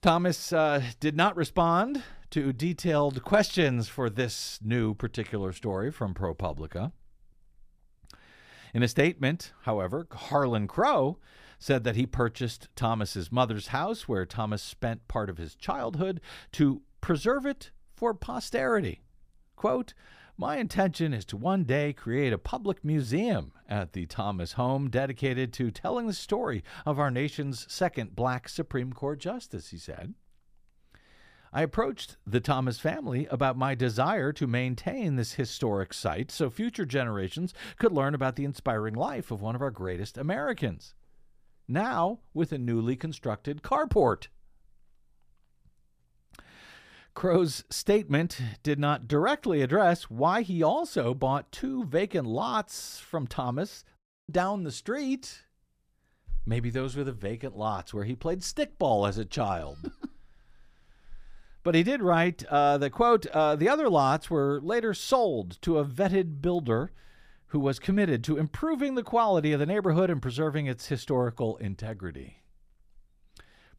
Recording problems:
audio cutting out; at 54 s

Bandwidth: 15 kHz